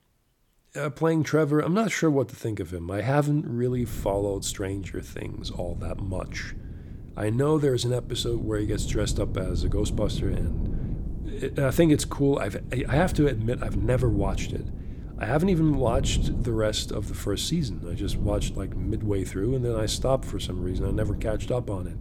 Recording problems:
wind noise on the microphone; occasional gusts; from 3.5 s on; 15 dB below the speech

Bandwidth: 18 kHz